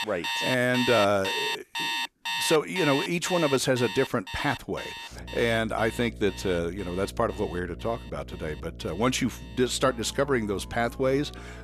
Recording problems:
alarms or sirens; loud; throughout; 4 dB below the speech
electrical hum; faint; from 5 s on; 60 Hz, 25 dB below the speech

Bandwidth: 14.5 kHz